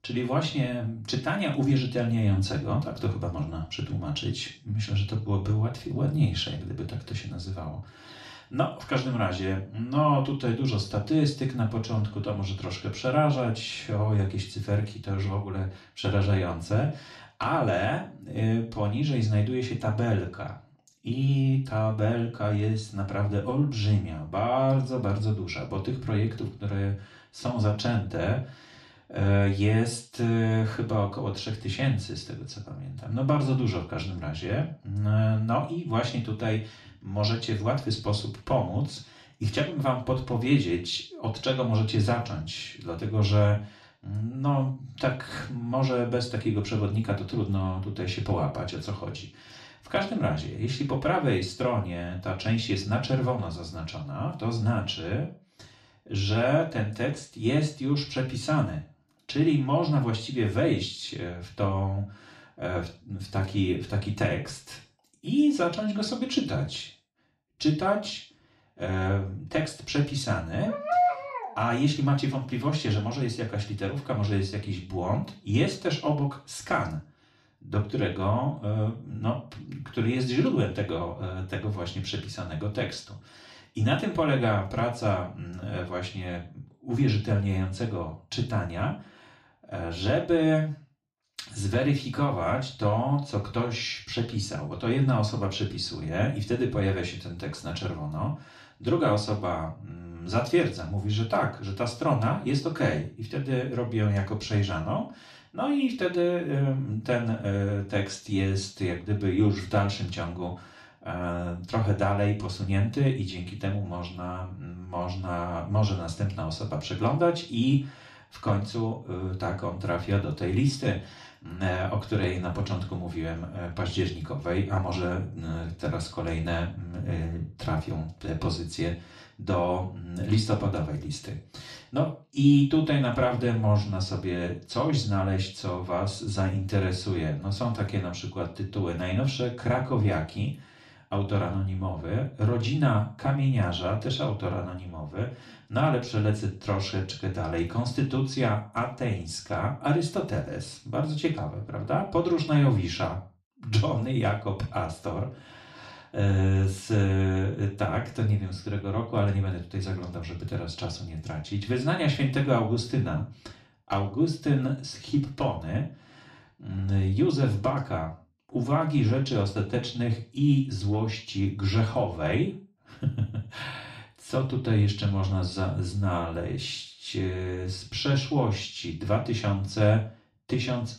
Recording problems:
off-mic speech; far
room echo; slight; dies away in 0.3 s
dog barking; loud; at 1:11; peak 4 dB above the speech

